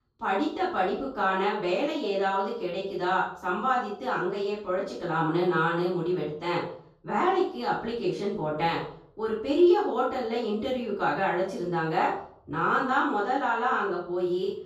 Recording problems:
off-mic speech; far
room echo; noticeable; dies away in 0.5 s

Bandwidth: 14.5 kHz